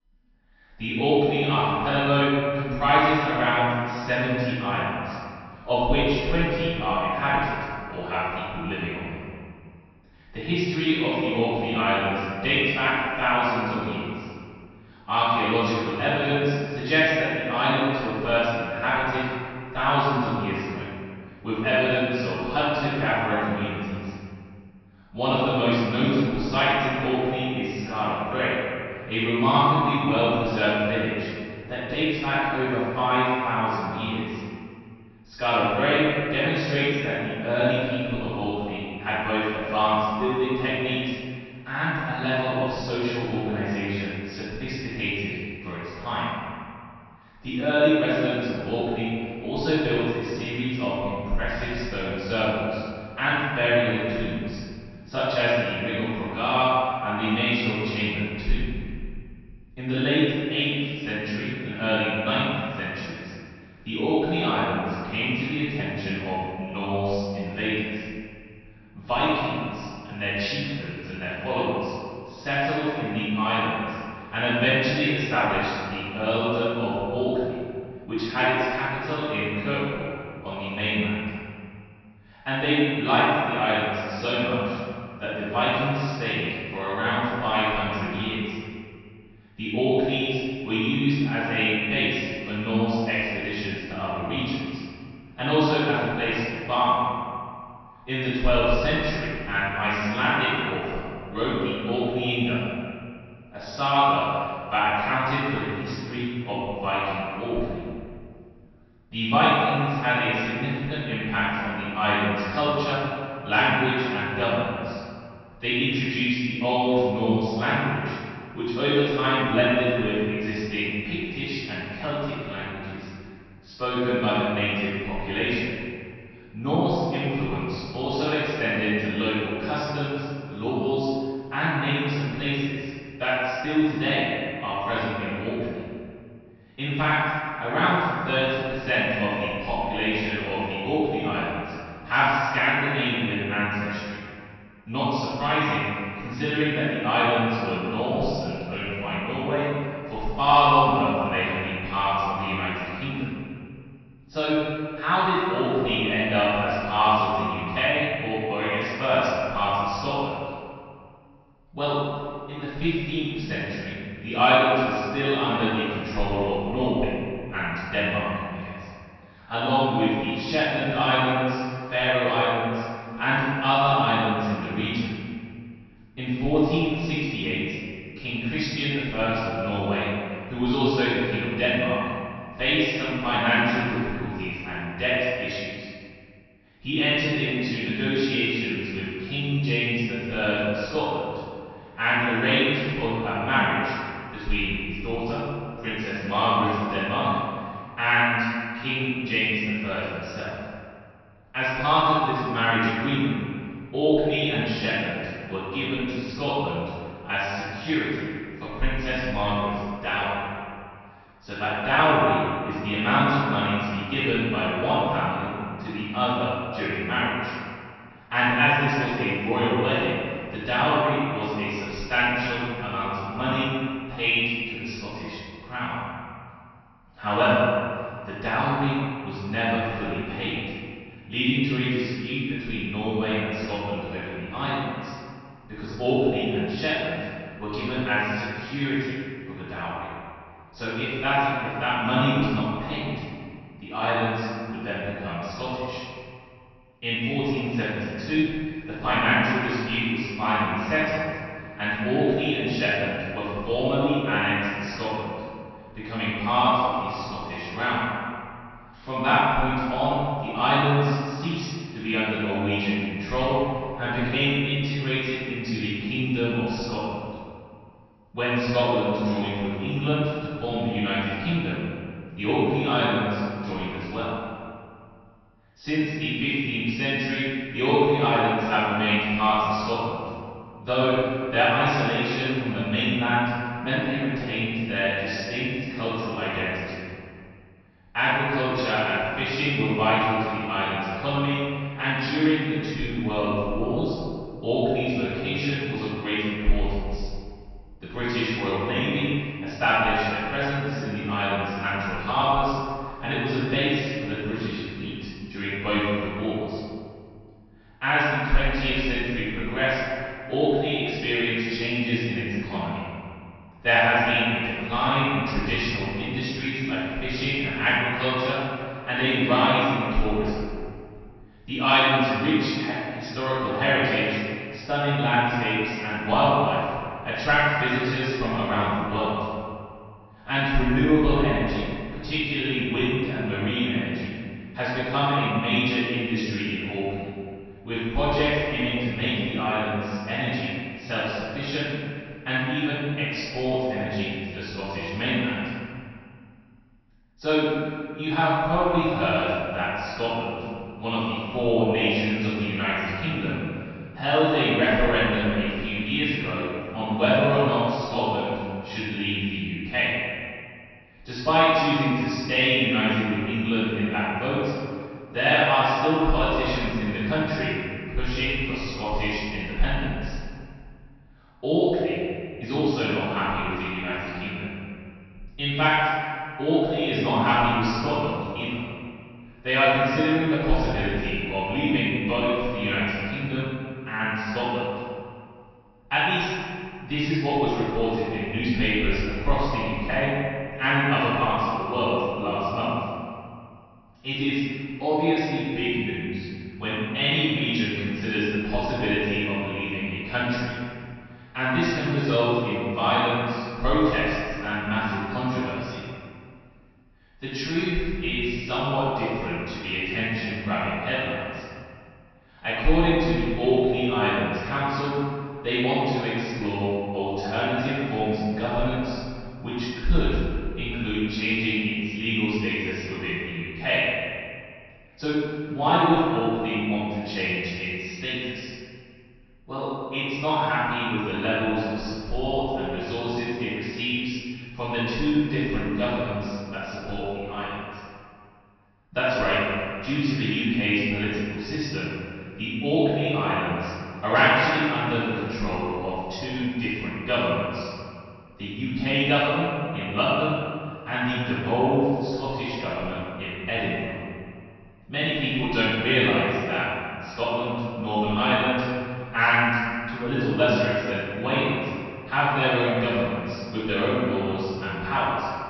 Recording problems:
room echo; strong; dies away in 2.1 s
off-mic speech; far
high frequencies cut off; noticeable; nothing above 5.5 kHz

